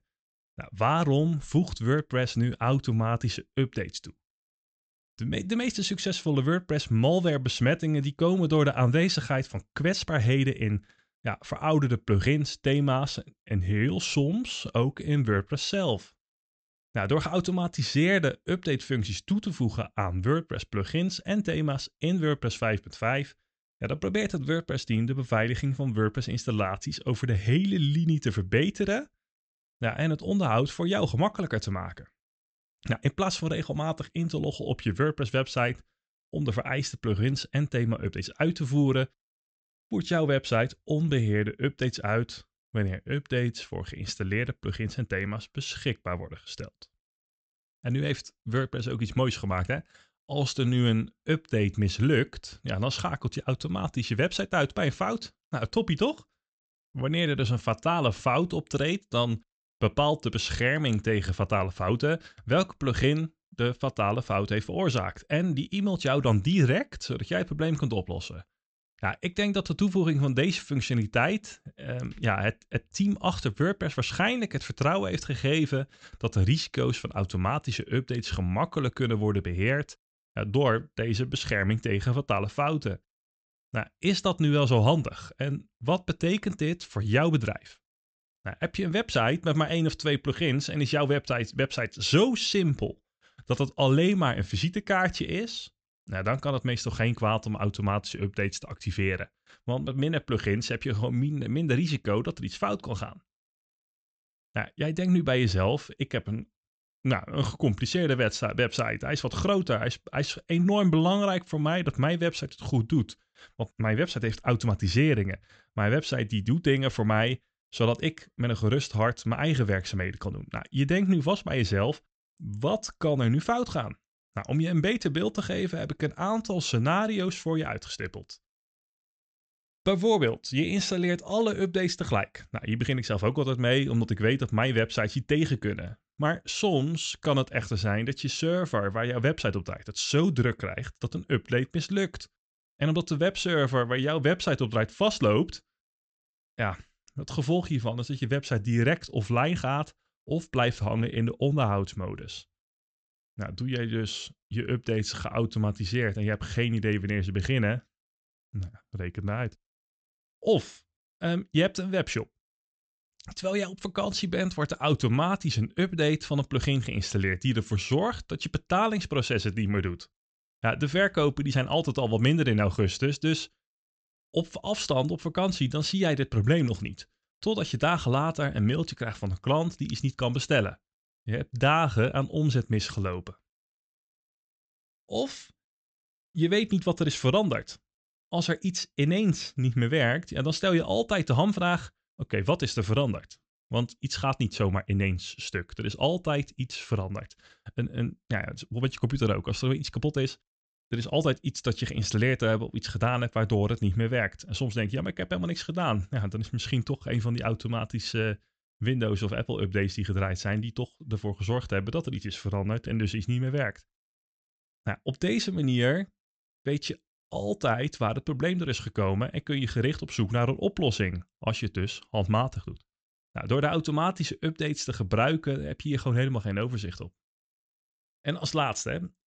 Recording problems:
high frequencies cut off; noticeable; nothing above 8 kHz

